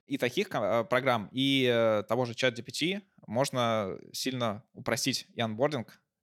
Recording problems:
none

